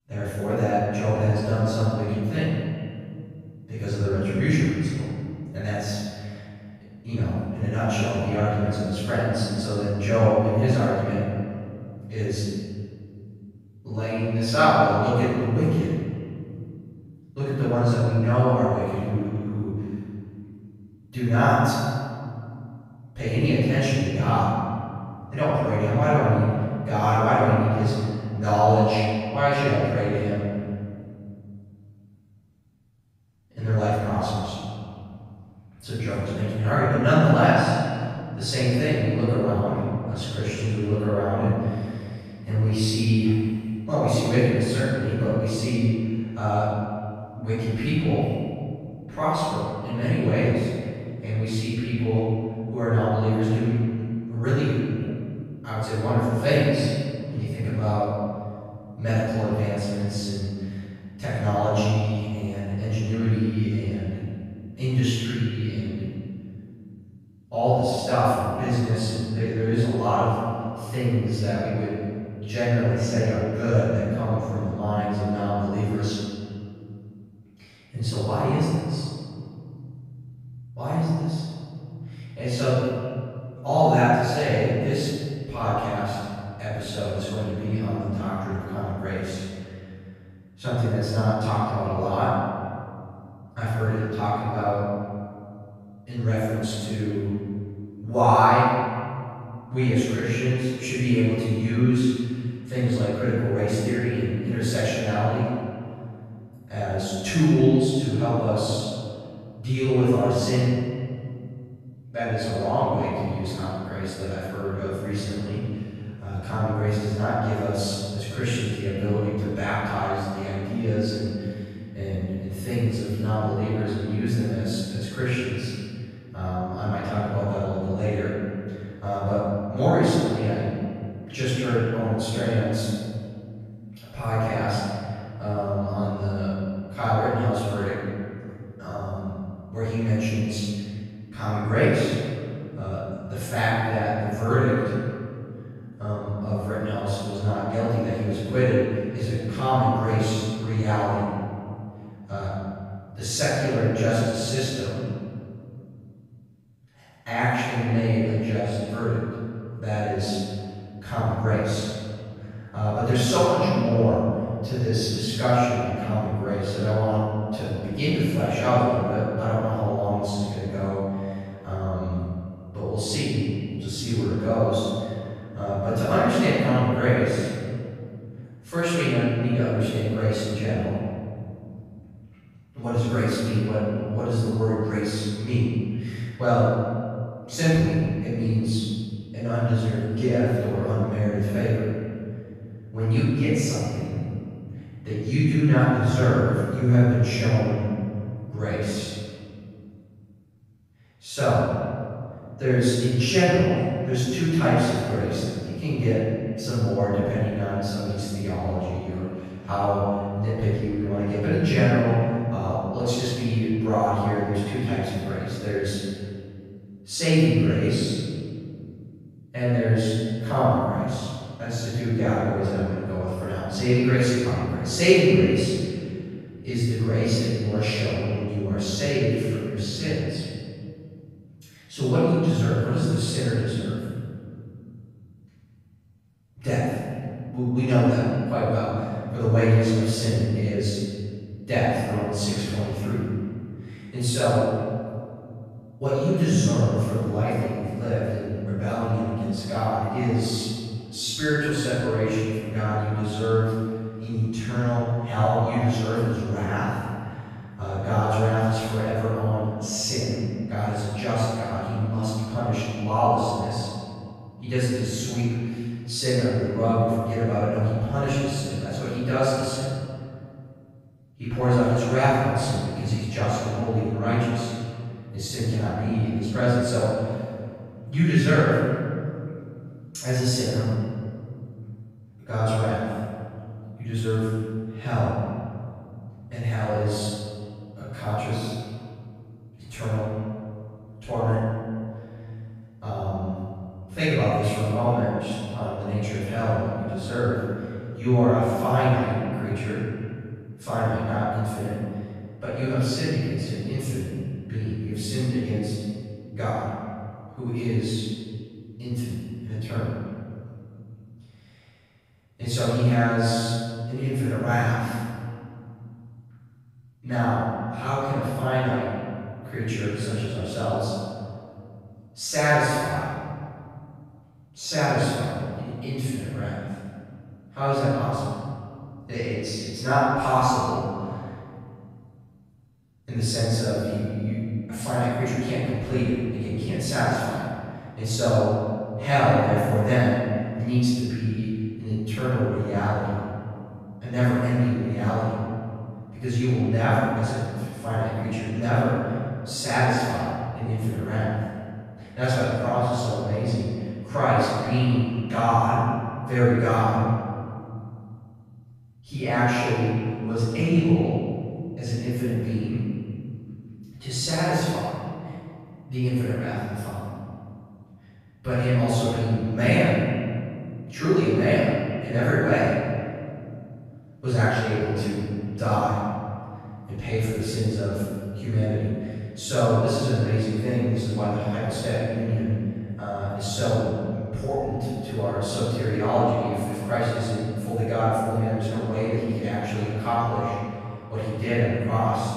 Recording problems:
room echo; strong; dies away in 2.1 s
off-mic speech; far
echo of what is said; noticeable; throughout; 190 ms later, 20 dB below the speech

